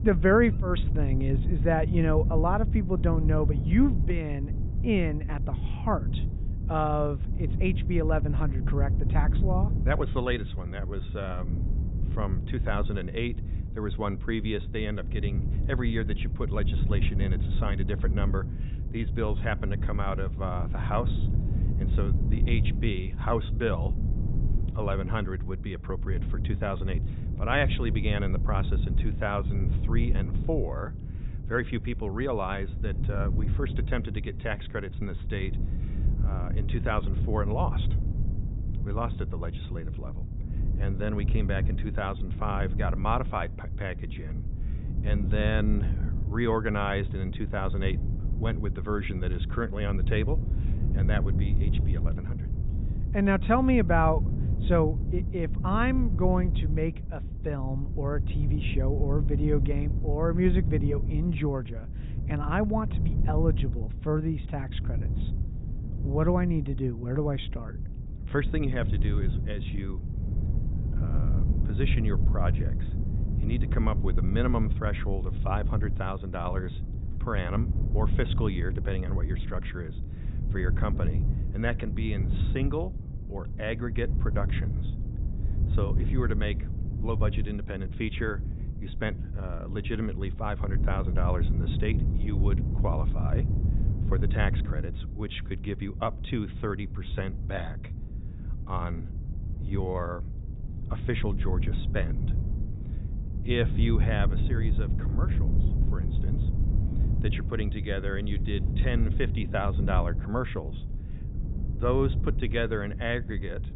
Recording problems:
high frequencies cut off; severe; nothing above 4 kHz
wind noise on the microphone; occasional gusts; 10 dB below the speech

